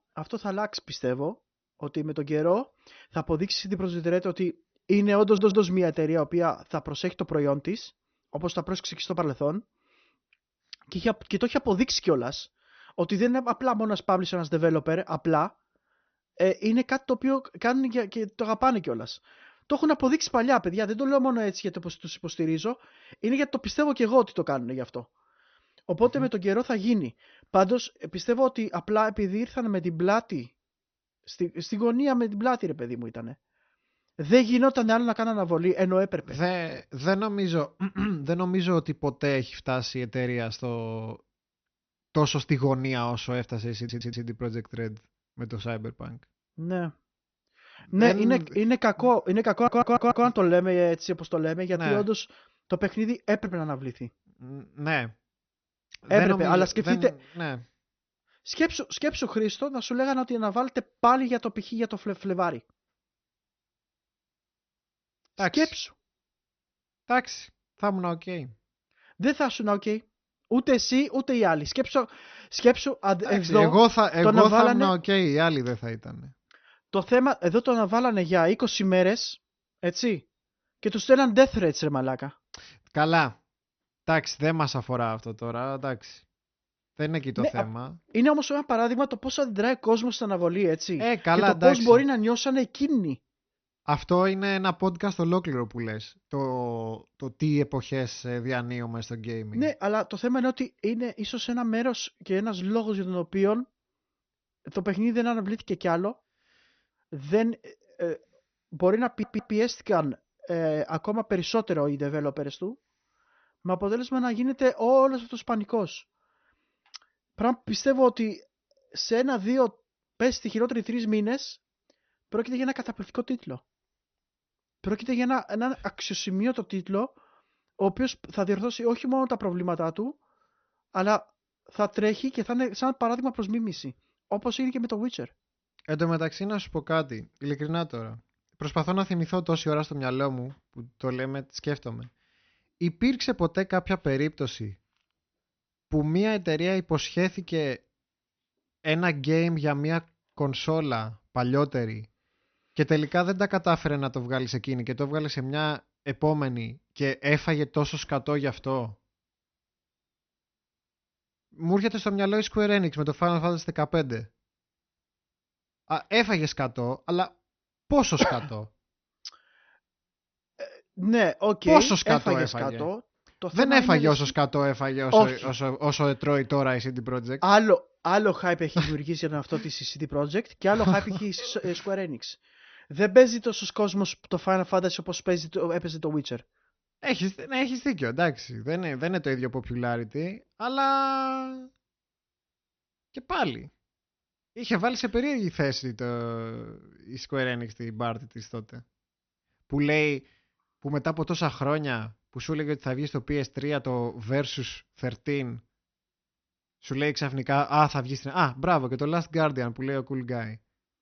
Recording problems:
high frequencies cut off; noticeable; nothing above 6 kHz
audio stuttering; 4 times, first at 5 s

